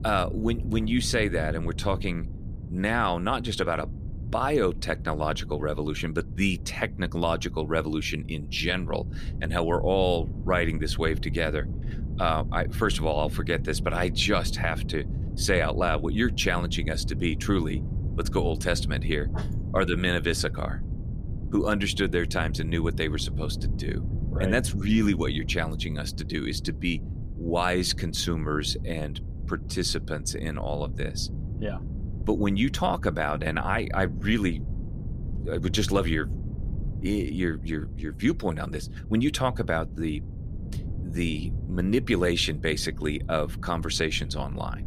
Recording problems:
wind noise on the microphone; occasional gusts; 15 dB below the speech

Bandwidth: 15.5 kHz